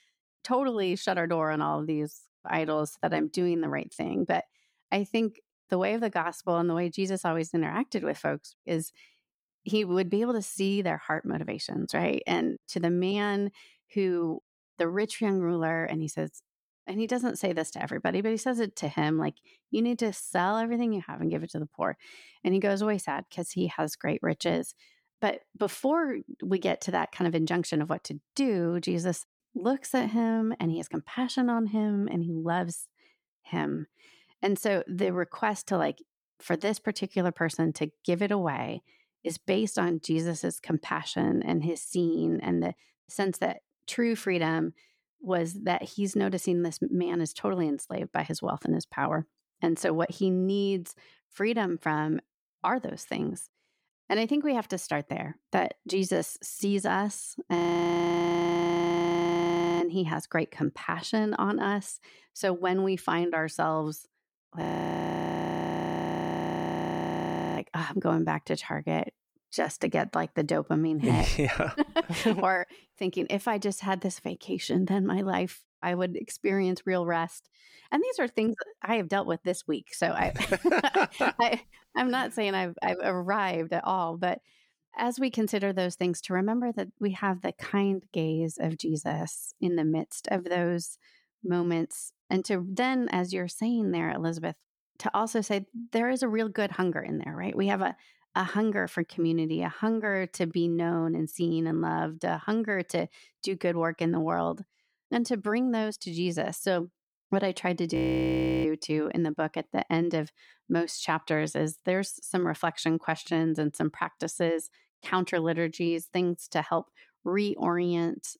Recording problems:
audio freezing; at 58 s for 2 s, at 1:05 for 3 s and at 1:48 for 0.5 s

